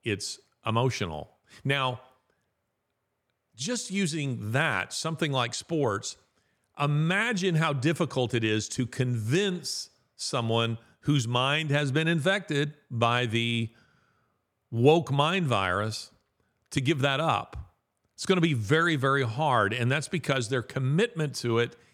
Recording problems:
none

